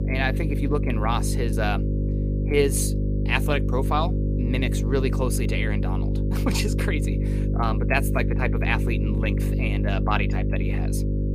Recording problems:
electrical hum; loud; throughout; 50 Hz, 7 dB below the speech

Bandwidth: 15 kHz